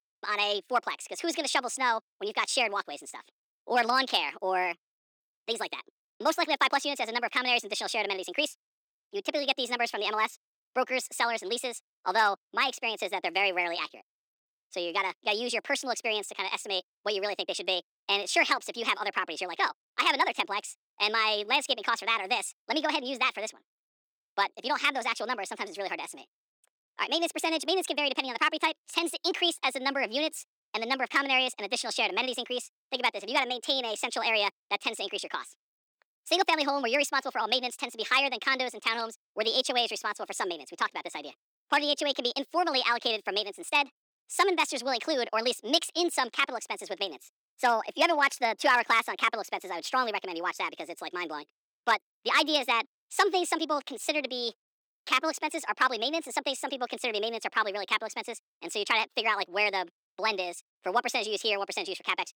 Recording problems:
wrong speed and pitch; too fast and too high; 1.5 times normal speed
thin; very slightly; fading below 300 Hz

